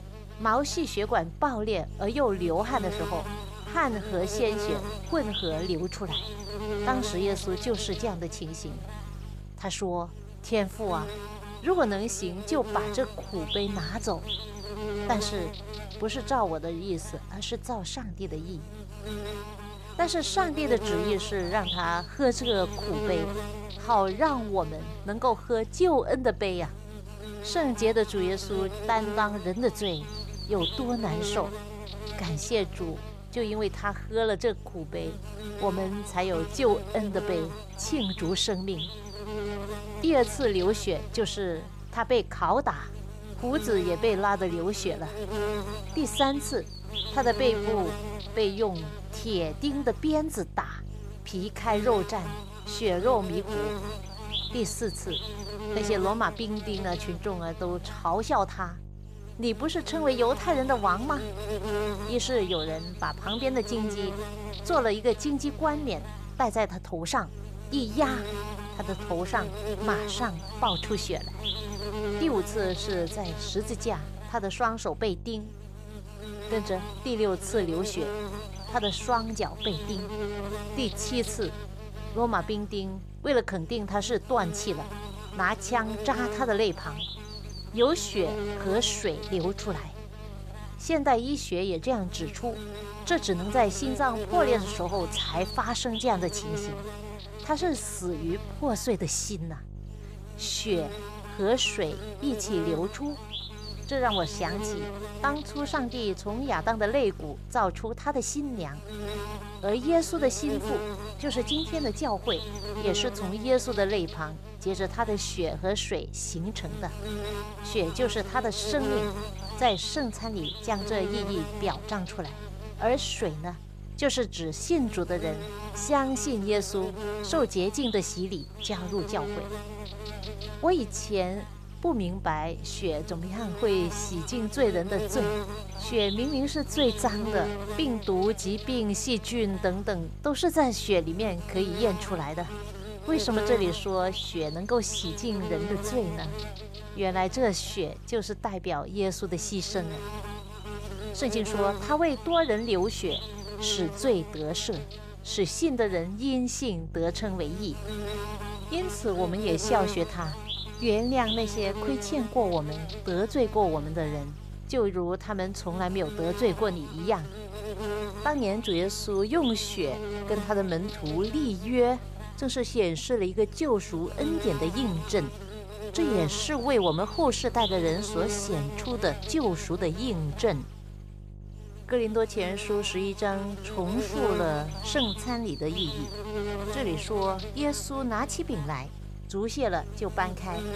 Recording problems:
electrical hum; loud; throughout; 50 Hz, 8 dB below the speech

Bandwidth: 14.5 kHz